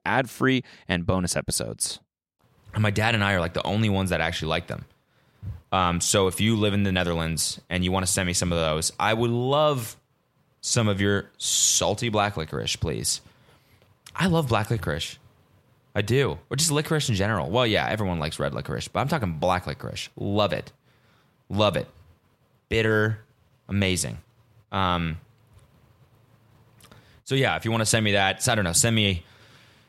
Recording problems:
none

